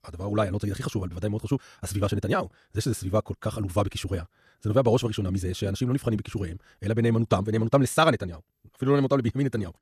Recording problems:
wrong speed, natural pitch; too fast; 1.8 times normal speed

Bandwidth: 14.5 kHz